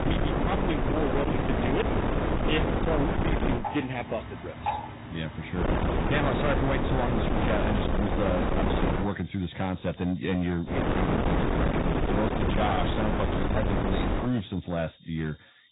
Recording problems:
distortion; heavy; 27% of the sound clipped
garbled, watery; badly; nothing above 4 kHz
wind noise on the microphone; heavy; until 3.5 s, from 5.5 to 9 s and from 11 to 14 s; 1 dB above the speech
animal sounds; noticeable; throughout; 10 dB below the speech

